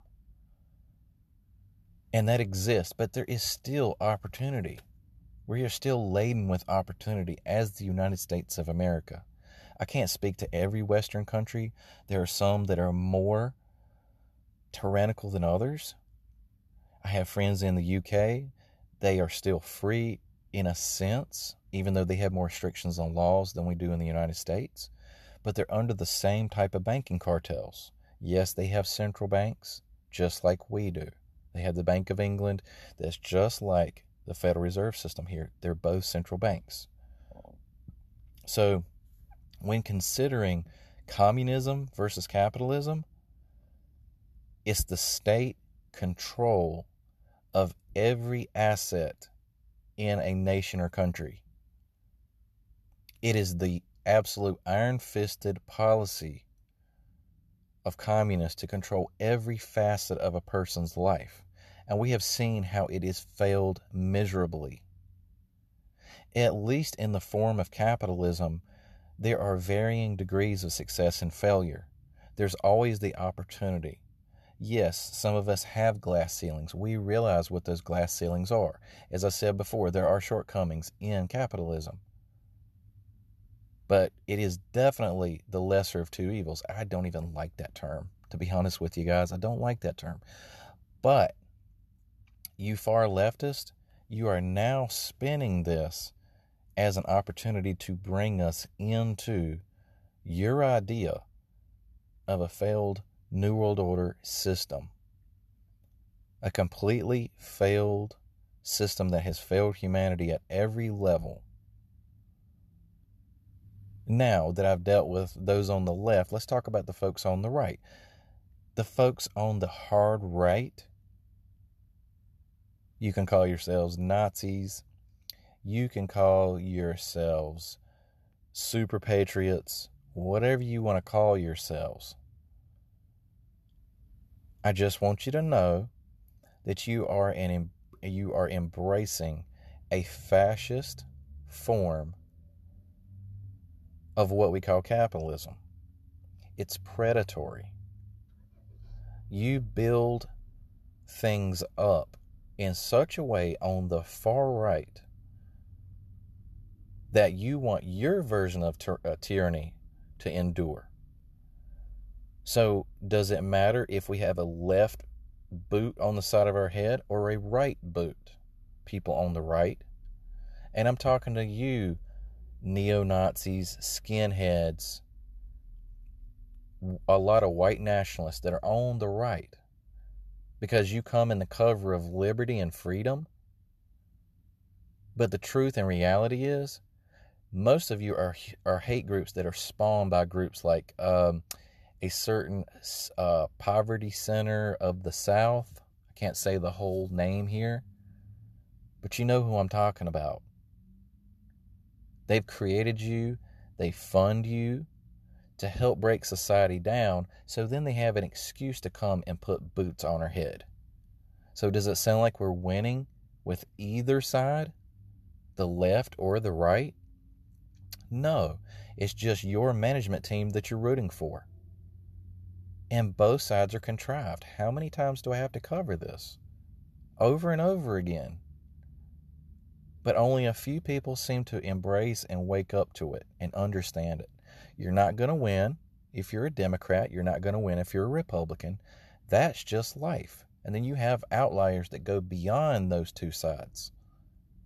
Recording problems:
none

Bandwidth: 13.5 kHz